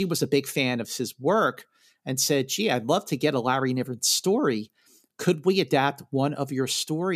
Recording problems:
abrupt cut into speech; at the start and the end

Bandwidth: 14.5 kHz